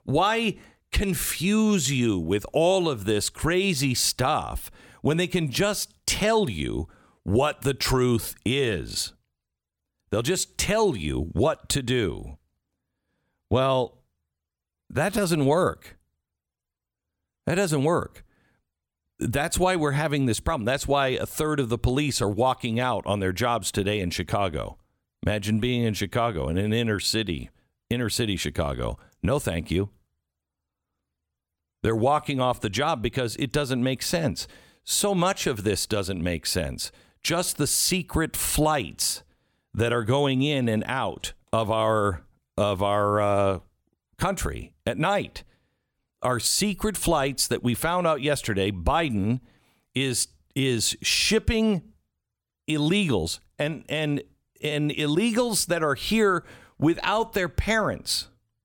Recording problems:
none

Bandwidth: 17.5 kHz